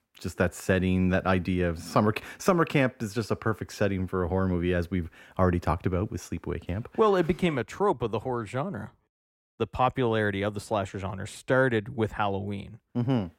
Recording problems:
muffled; slightly; fading above 3 kHz

